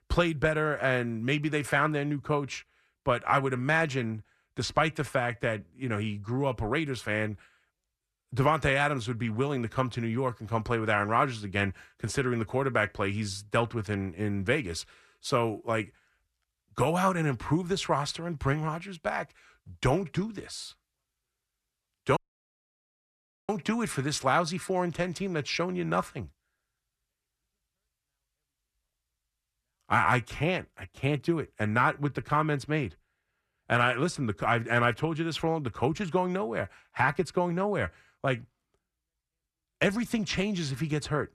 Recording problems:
audio cutting out; at 22 s for 1.5 s

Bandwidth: 13.5 kHz